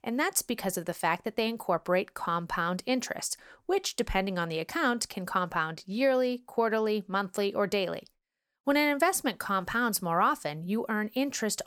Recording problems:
none

